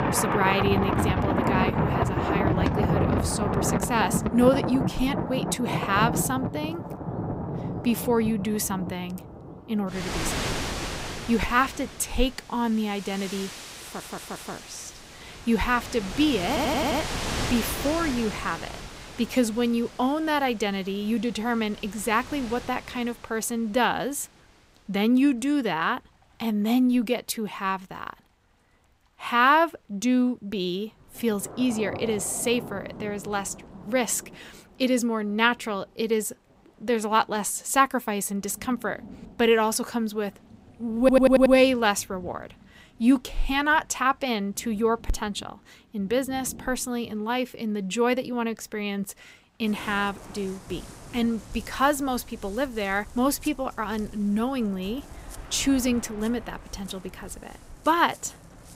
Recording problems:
rain or running water; loud; throughout; 5 dB below the speech
audio stuttering; at 14 s, at 16 s and at 41 s

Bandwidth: 15.5 kHz